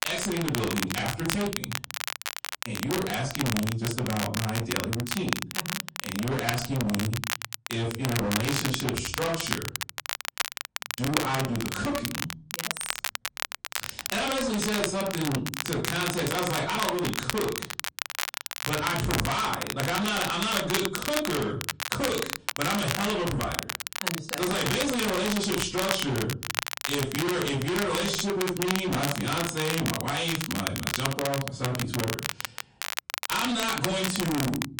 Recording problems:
distortion; heavy; 24% of the sound clipped
off-mic speech; far
room echo; very slight; dies away in 0.4 s
garbled, watery; slightly; nothing above 9 kHz
crackle, like an old record; loud; 3 dB below the speech

